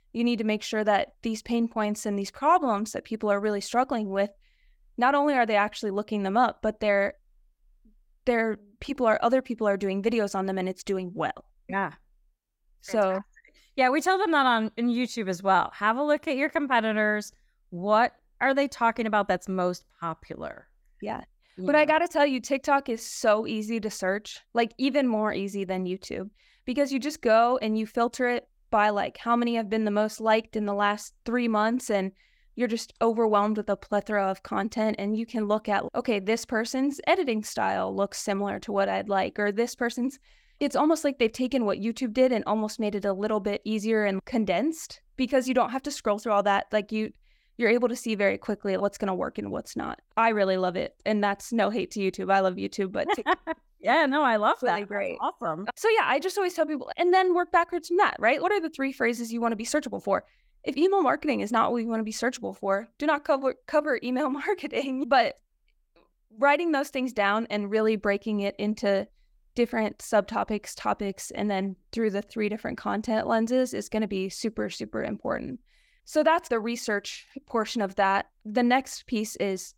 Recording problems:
none

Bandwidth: 17.5 kHz